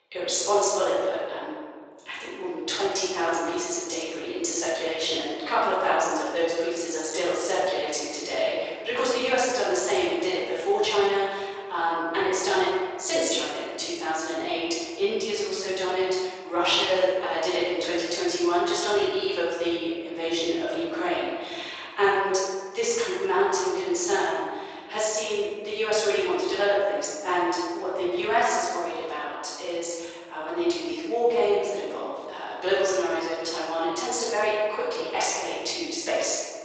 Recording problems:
room echo; strong; dies away in 1.5 s
off-mic speech; far
thin; very; fading below 450 Hz
garbled, watery; slightly; nothing above 7.5 kHz

